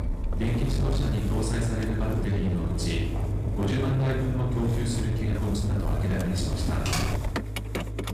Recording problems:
off-mic speech; far
room echo; noticeable; dies away in 0.9 s
distortion; slight; 20% of the sound clipped
traffic noise; loud; throughout; 2 dB below the speech
uneven, jittery; strongly; from 1 to 6.5 s
footsteps; noticeable; from 2 to 3.5 s; peak 8 dB below the speech
keyboard typing; noticeable; at 7 s; peak level with the speech

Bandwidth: 15 kHz